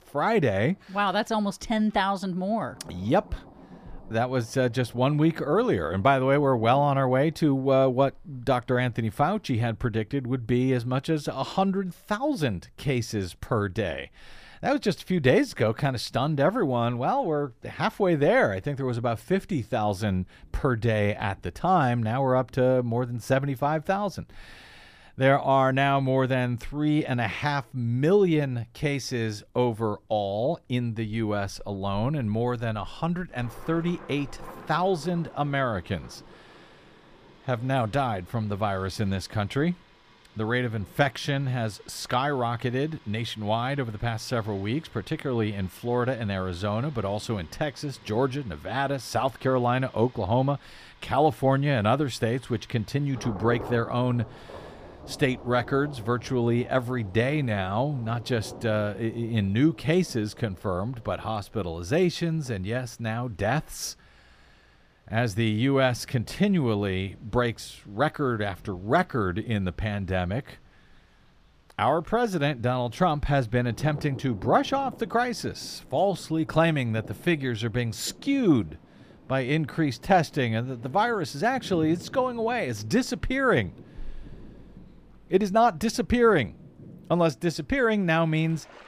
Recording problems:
rain or running water; faint; throughout; 20 dB below the speech

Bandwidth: 15 kHz